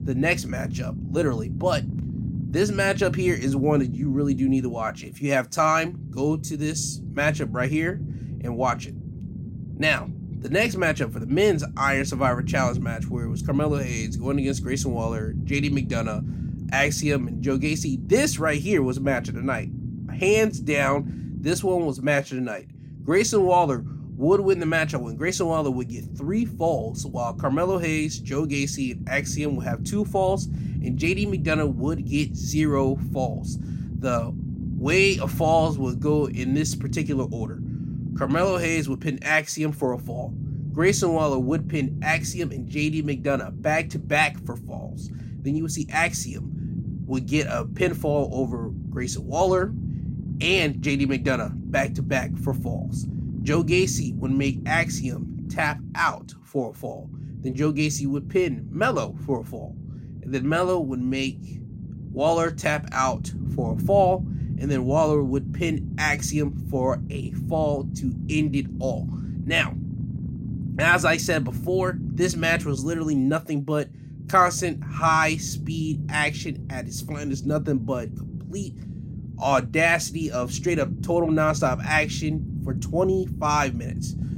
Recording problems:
low rumble; noticeable; throughout; 15 dB below the speech

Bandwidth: 16 kHz